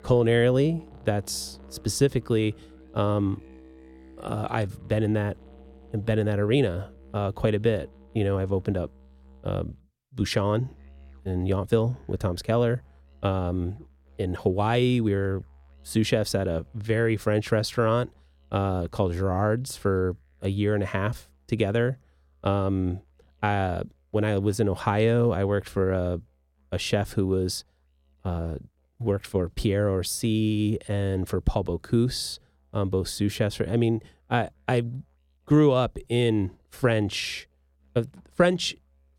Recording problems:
background music; faint; throughout; 25 dB below the speech

